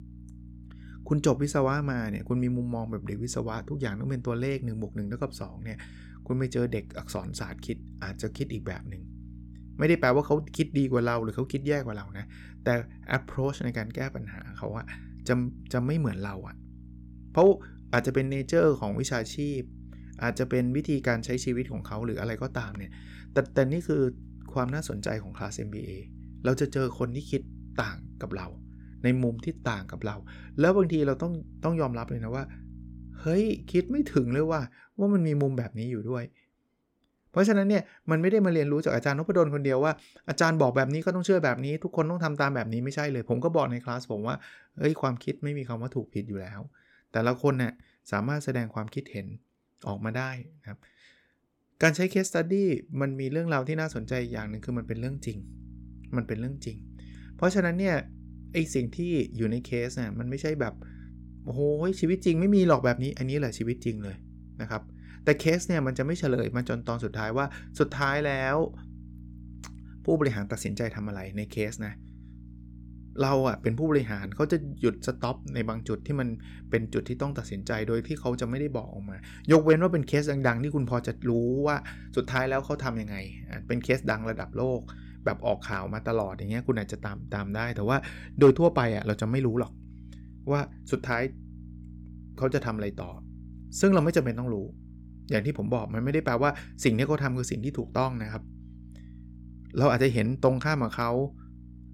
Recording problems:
electrical hum; faint; until 35 s and from 54 s on; 60 Hz, 25 dB below the speech

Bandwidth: 17 kHz